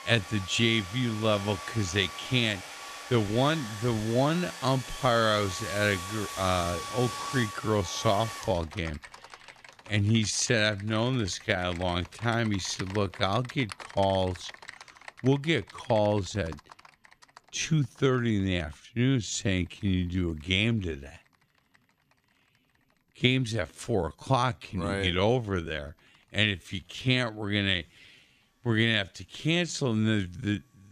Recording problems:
wrong speed, natural pitch; too slow; 0.6 times normal speed
household noises; noticeable; throughout; 10 dB below the speech

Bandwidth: 14.5 kHz